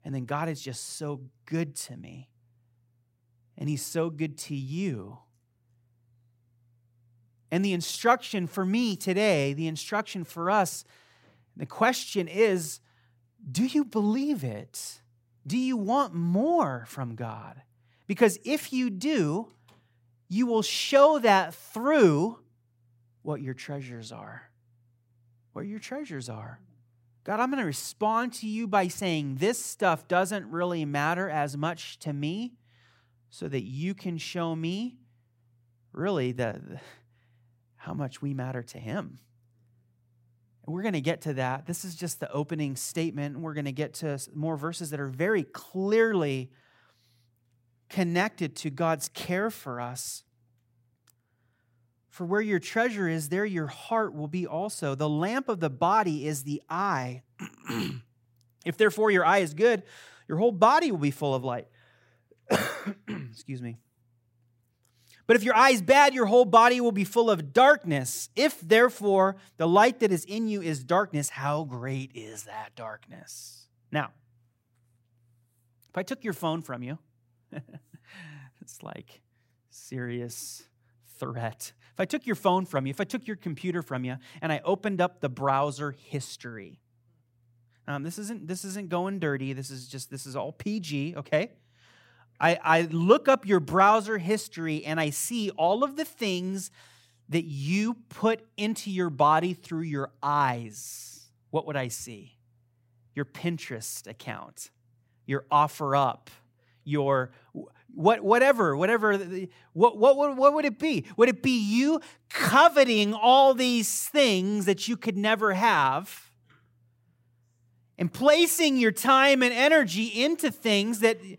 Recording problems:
none

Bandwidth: 16 kHz